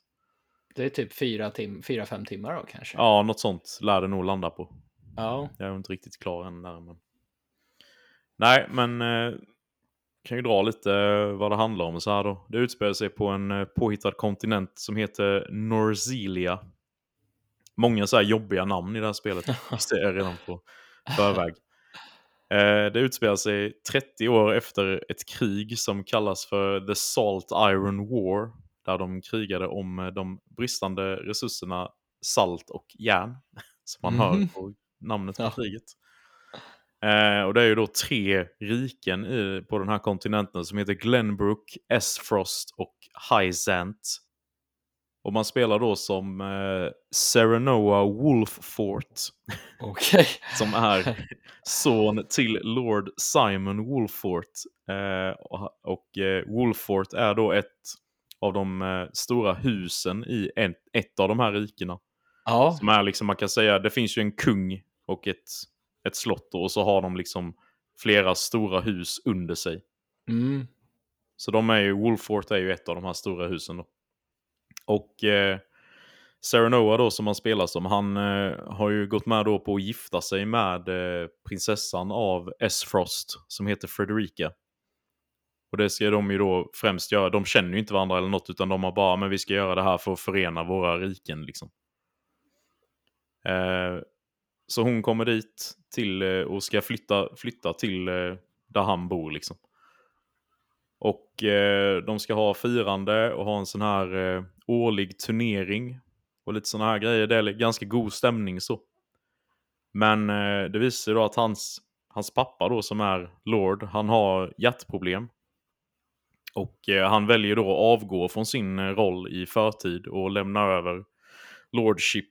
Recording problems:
none

